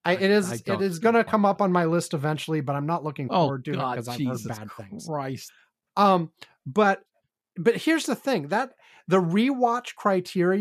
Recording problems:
abrupt cut into speech; at the end

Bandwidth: 14.5 kHz